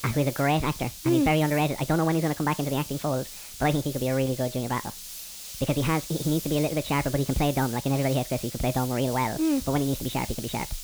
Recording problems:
high frequencies cut off; severe; nothing above 4 kHz
wrong speed and pitch; too fast and too high; 1.5 times normal speed
hiss; noticeable; throughout; 10 dB below the speech

